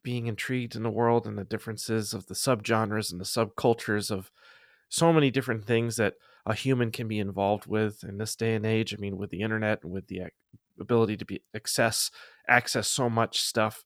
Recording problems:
none

